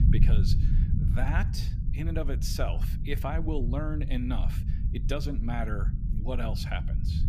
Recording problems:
low rumble; loud; throughout; 7 dB below the speech

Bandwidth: 15 kHz